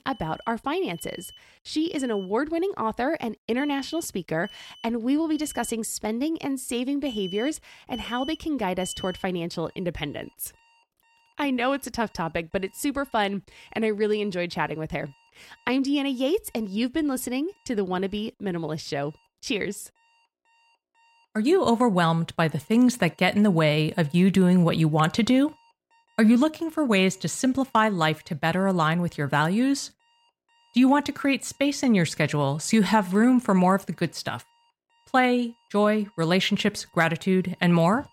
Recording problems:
alarms or sirens; noticeable; throughout; 20 dB below the speech

